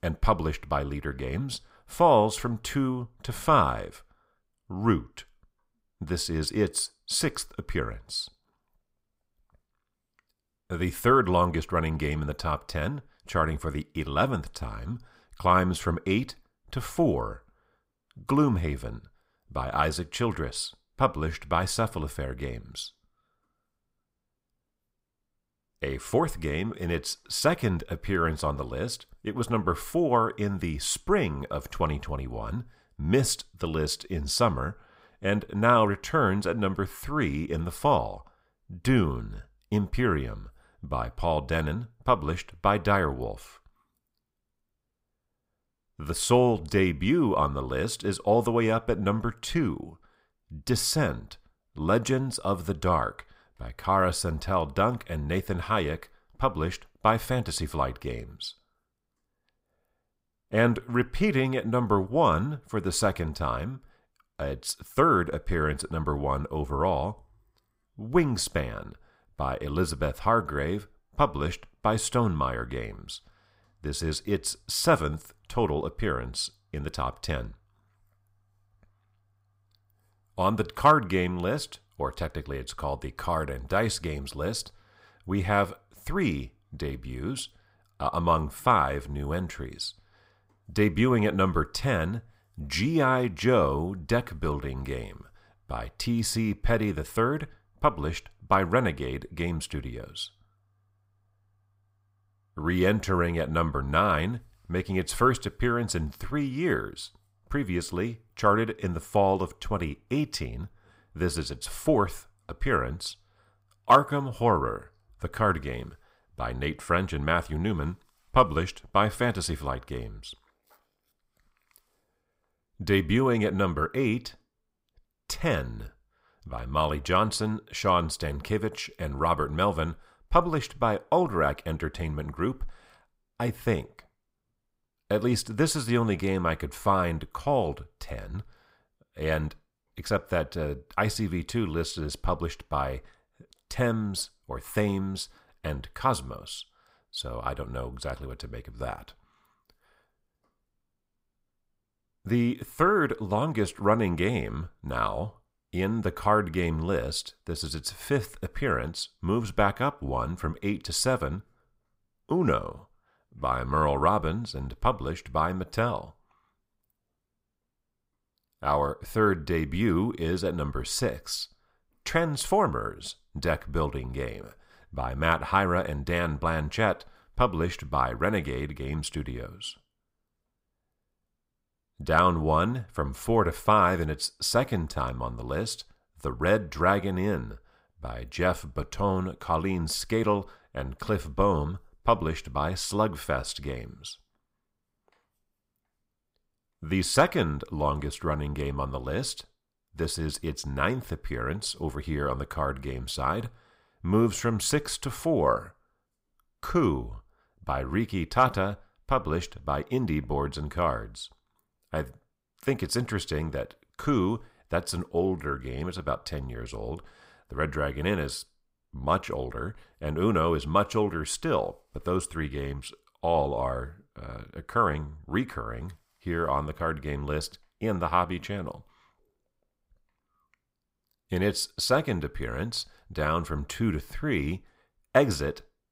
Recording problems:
none

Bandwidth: 15.5 kHz